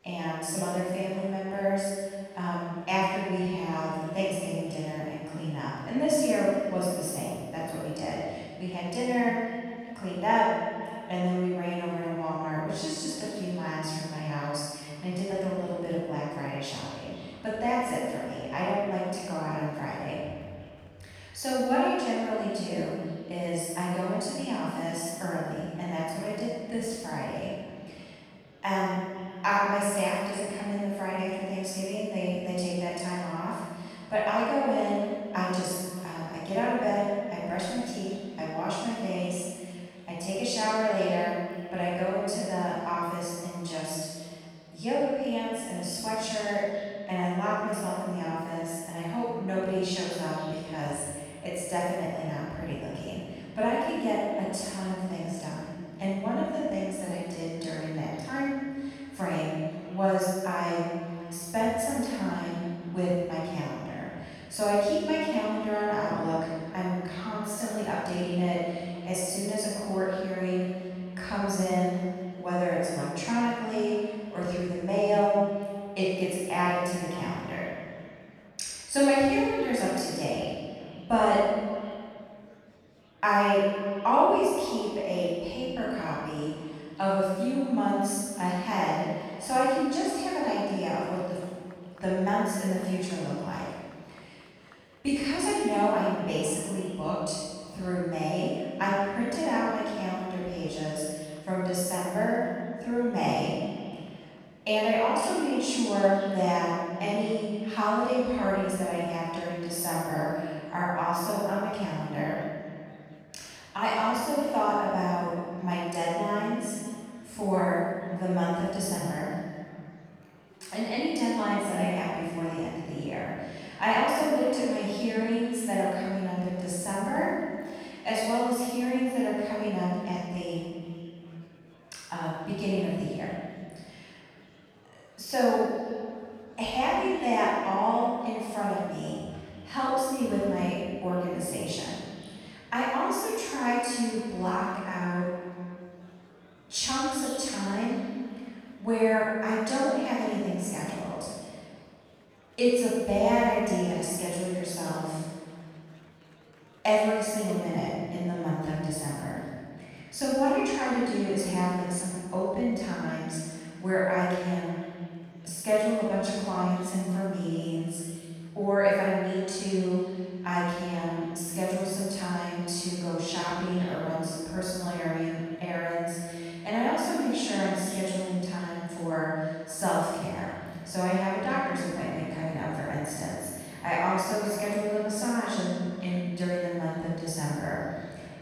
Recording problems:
room echo; strong; dies away in 1.5 s
off-mic speech; far
echo of what is said; faint; throughout; 510 ms later, 20 dB below the speech
murmuring crowd; faint; throughout; 30 dB below the speech

